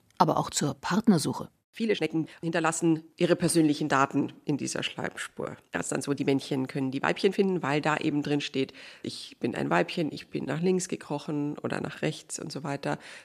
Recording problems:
uneven, jittery; strongly; from 1.5 to 11 s

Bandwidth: 14 kHz